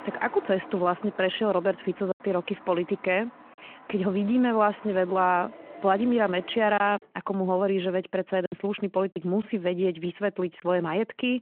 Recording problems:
phone-call audio
traffic noise; noticeable; until 7 s; 20 dB below the speech
choppy; occasionally; 3% of the speech affected

